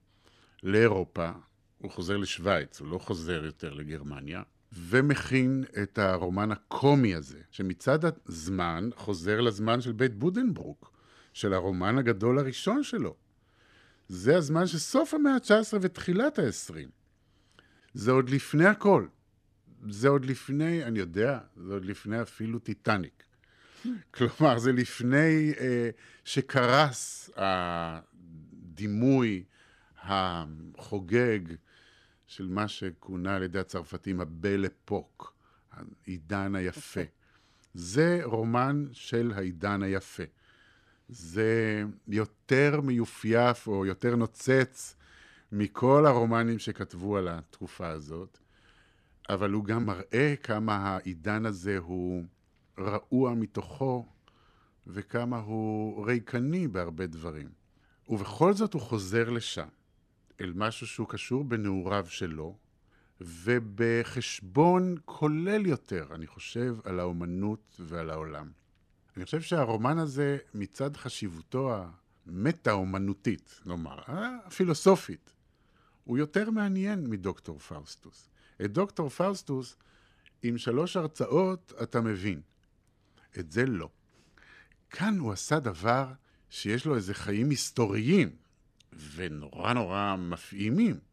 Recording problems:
none

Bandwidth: 14 kHz